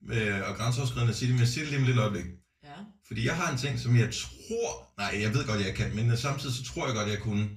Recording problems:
off-mic speech; far
room echo; very slight; dies away in 0.3 s

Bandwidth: 14.5 kHz